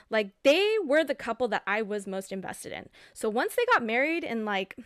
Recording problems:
none

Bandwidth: 14 kHz